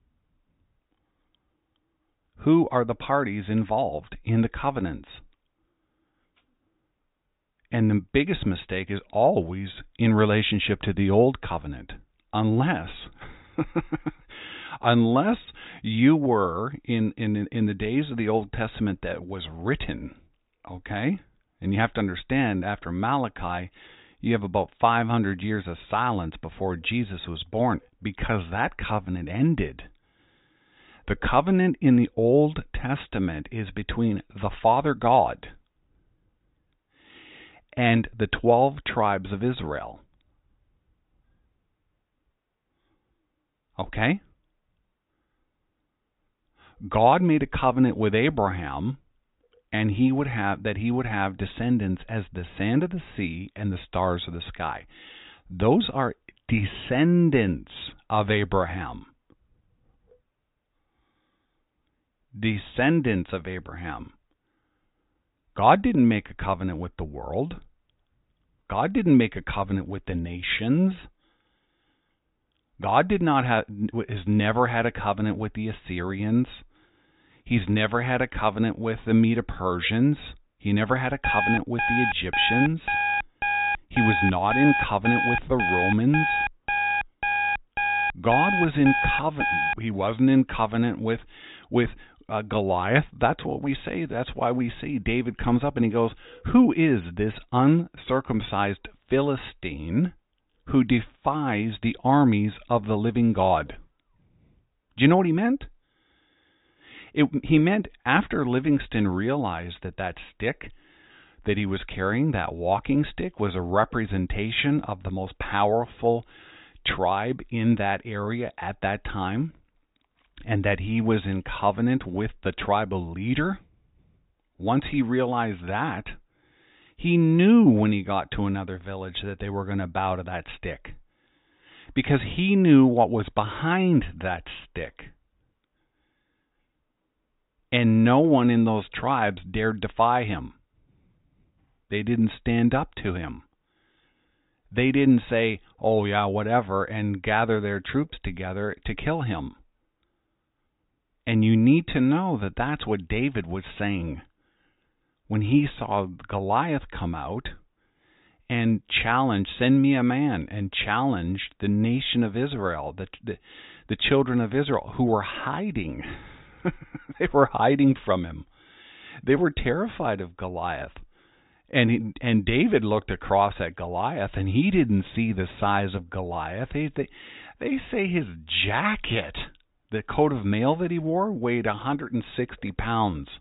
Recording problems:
high frequencies cut off; severe; nothing above 4 kHz
alarm; loud; from 1:21 to 1:30; peak 1 dB above the speech

